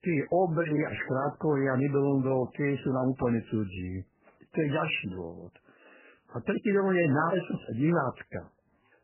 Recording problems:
garbled, watery; badly; nothing above 3 kHz

